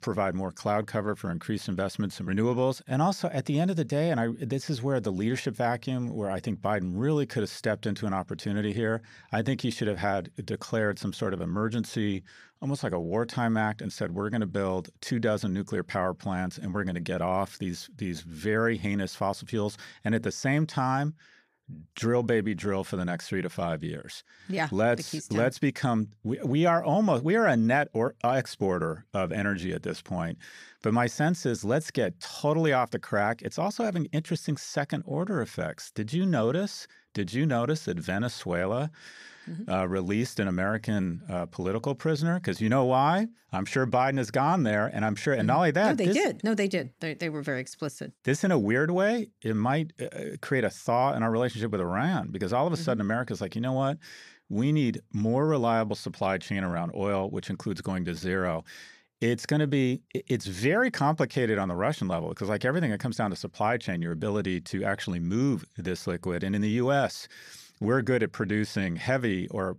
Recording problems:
none

